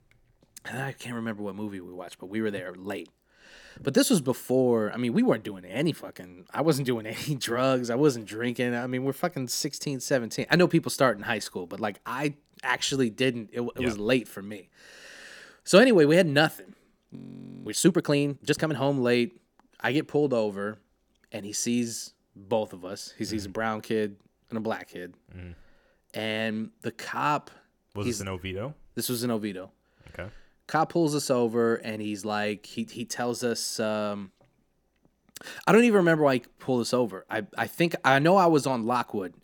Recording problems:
audio freezing; at 17 s for 0.5 s

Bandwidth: 18 kHz